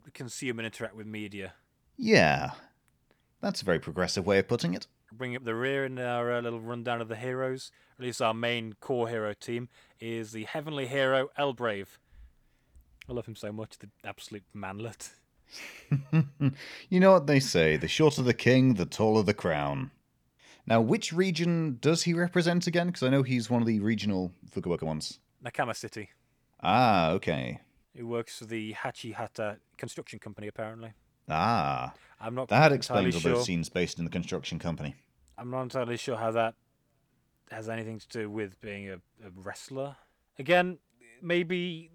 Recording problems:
uneven, jittery; strongly; from 5 to 39 s

